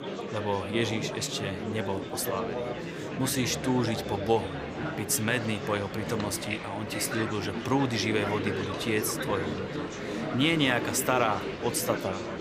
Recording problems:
murmuring crowd; loud; throughout; 4 dB below the speech

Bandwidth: 15 kHz